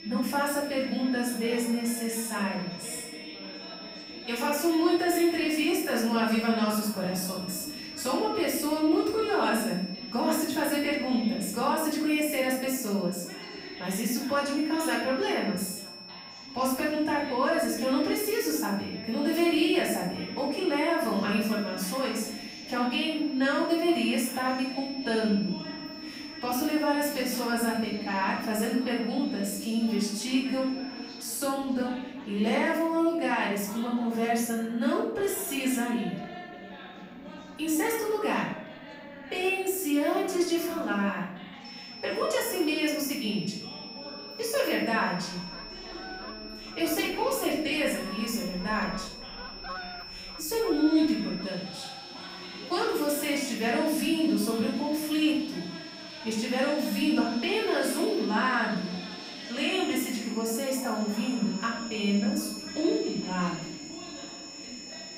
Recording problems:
off-mic speech; far
room echo; noticeable; dies away in 0.6 s
high-pitched whine; noticeable; until 31 s and from 42 s on; 5.5 kHz, 15 dB below the speech
animal sounds; noticeable; from 45 s on; 20 dB below the speech
background chatter; noticeable; throughout; 2 voices, 15 dB below the speech

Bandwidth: 15.5 kHz